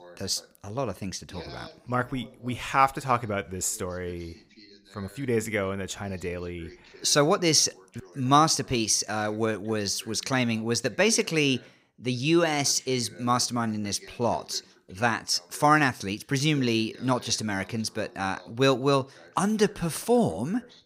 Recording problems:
voice in the background; faint; throughout; 25 dB below the speech

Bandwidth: 15.5 kHz